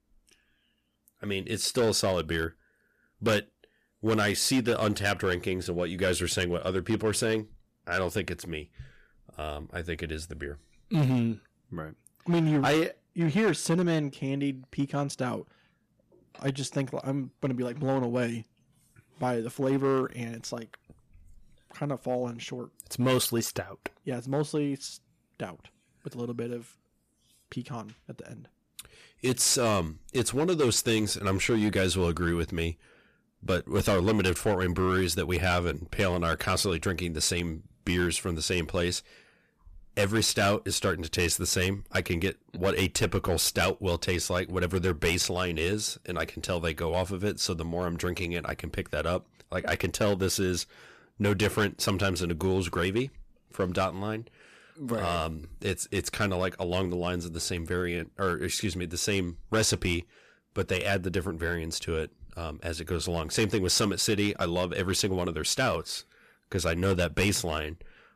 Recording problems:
distortion; slight; 4% of the sound clipped

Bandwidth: 14.5 kHz